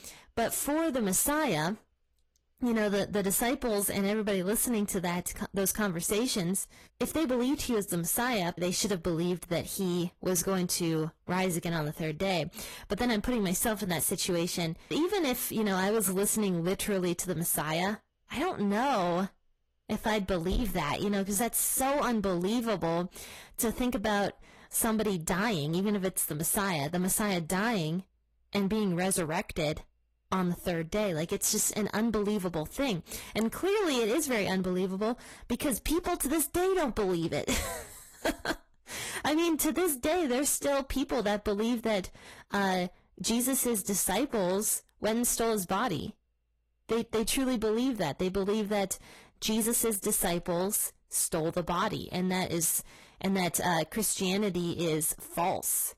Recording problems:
distortion; slight; 11% of the sound clipped
garbled, watery; slightly; nothing above 13 kHz

